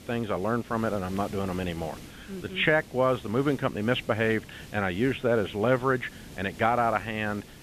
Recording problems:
high frequencies cut off; severe; nothing above 4 kHz
hiss; noticeable; throughout; 20 dB below the speech

